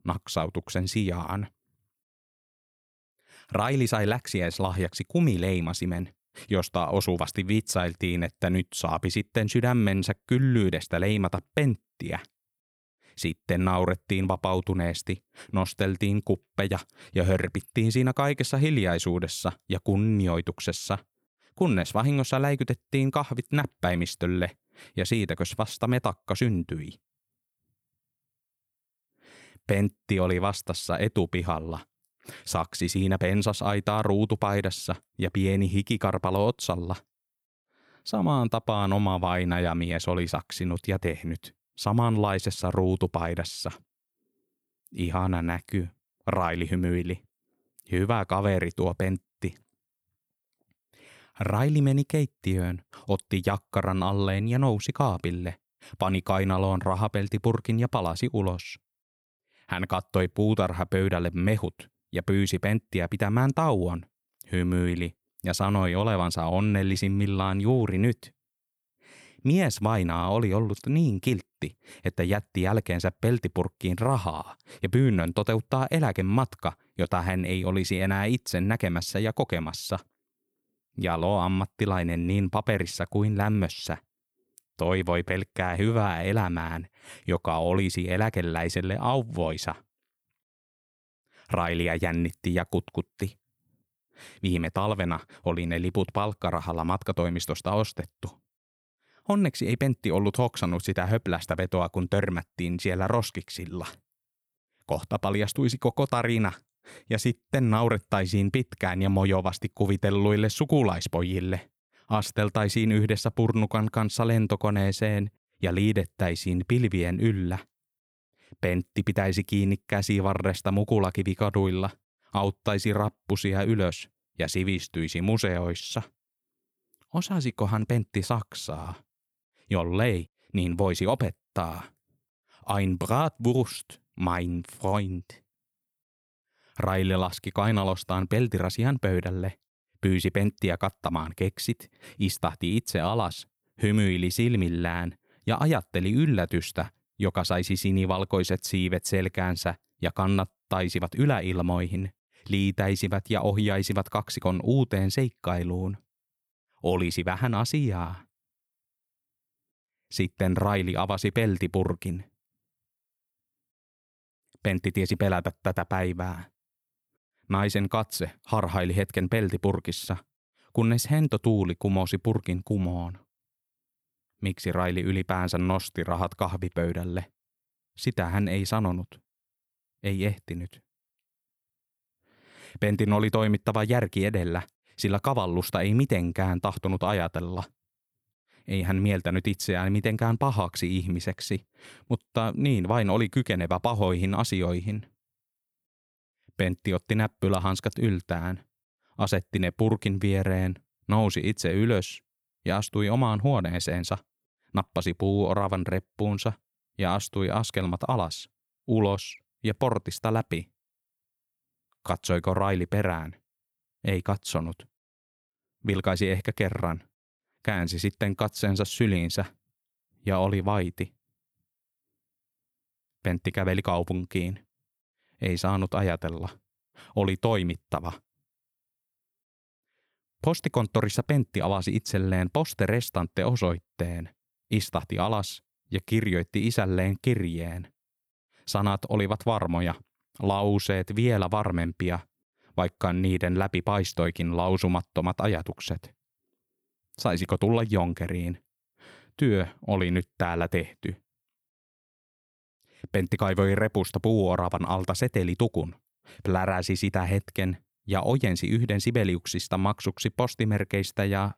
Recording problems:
none

